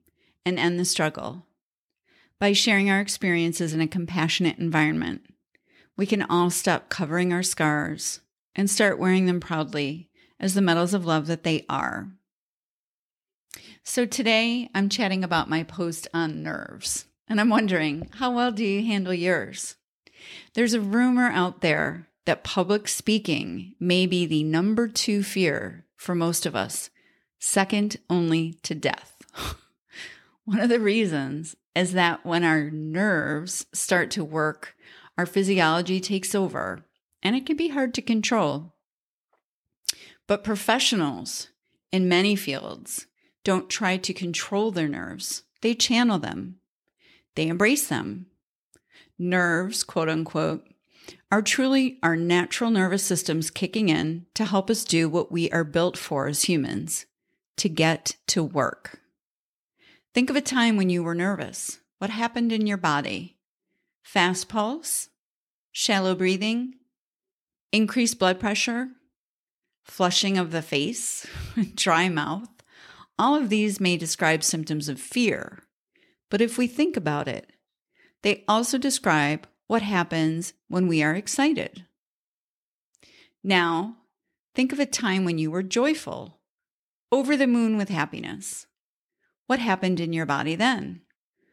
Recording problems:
none

